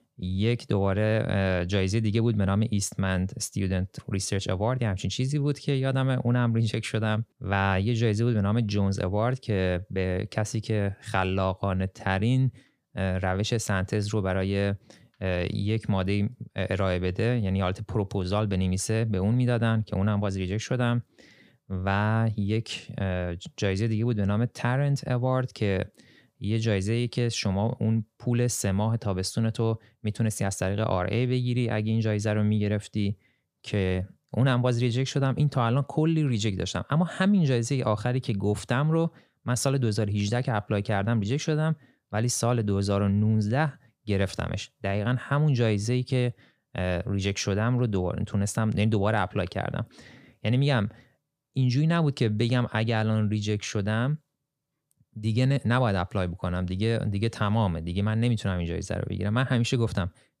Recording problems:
none

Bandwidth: 15 kHz